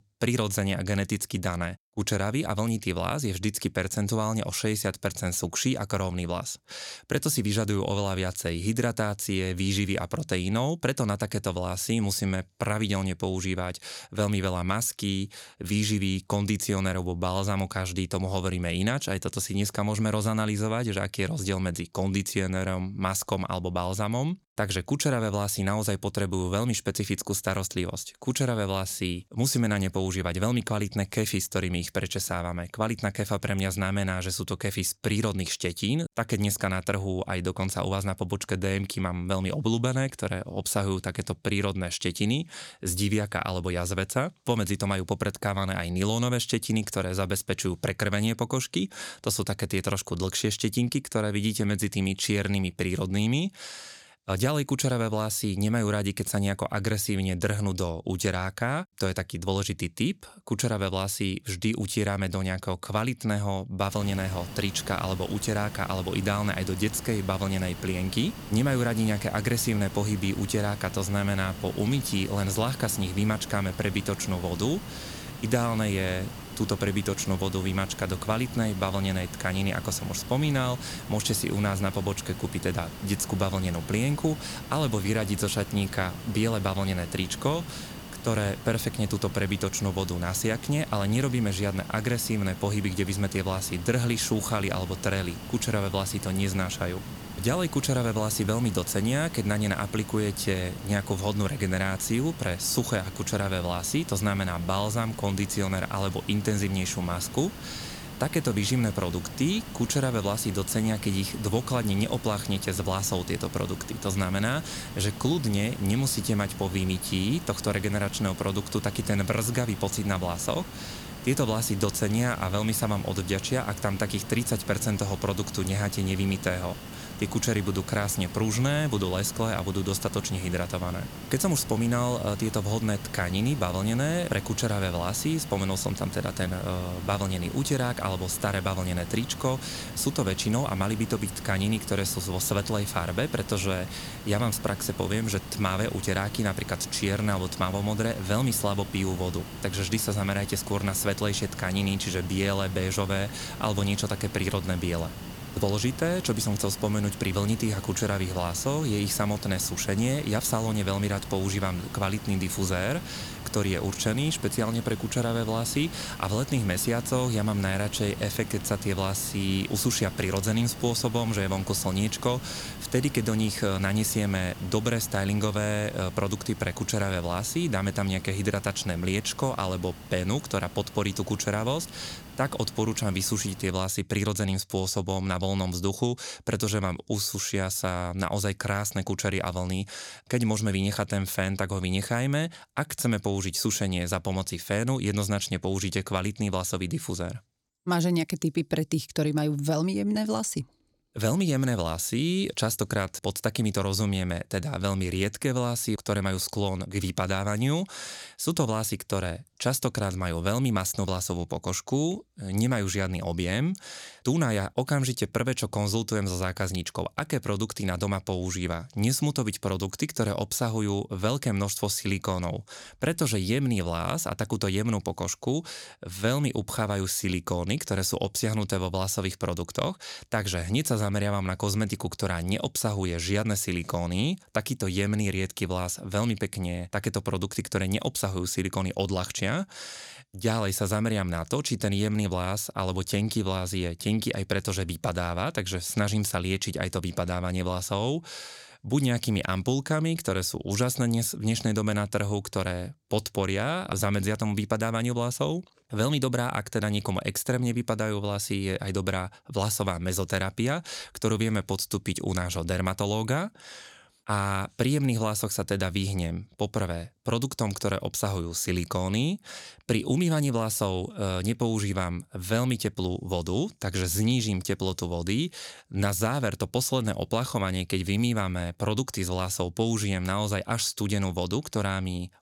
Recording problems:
hiss; noticeable; from 1:04 to 3:04; 10 dB below the speech

